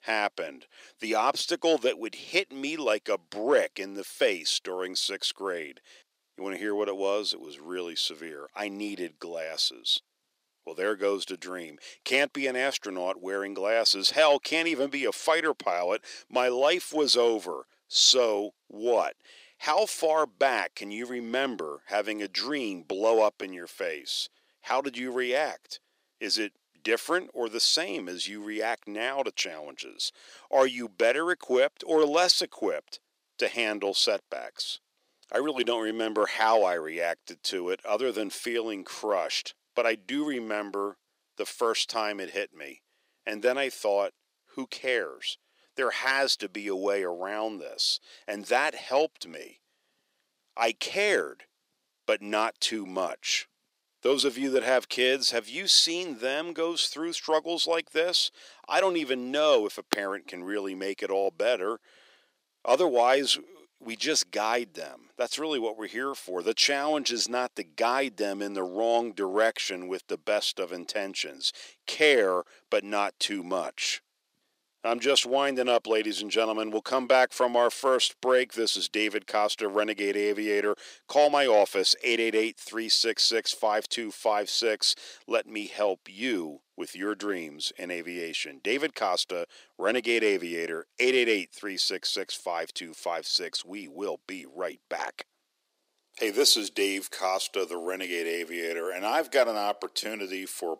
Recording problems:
thin; somewhat; fading below 350 Hz

